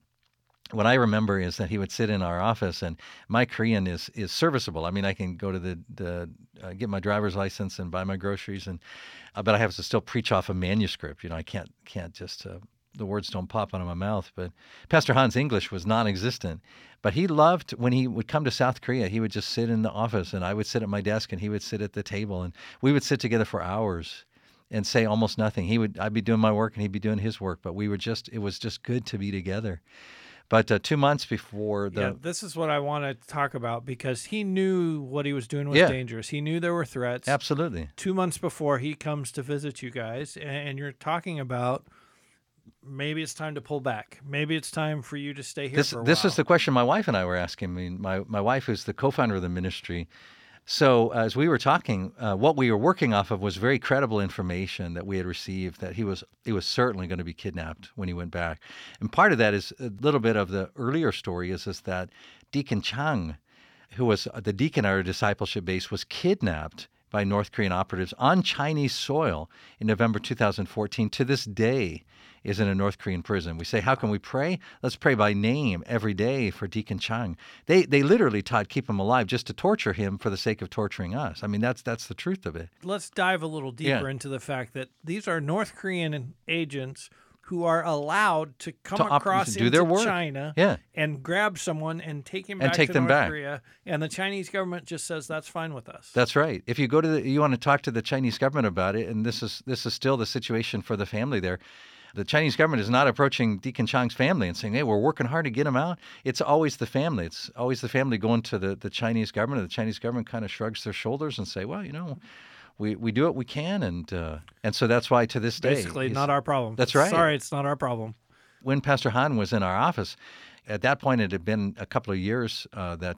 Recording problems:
none

